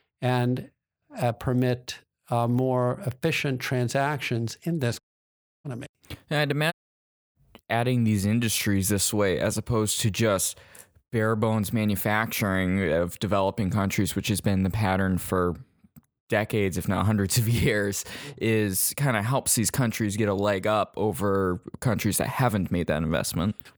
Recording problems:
audio cutting out; at 5 s for 0.5 s and at 6.5 s for 0.5 s

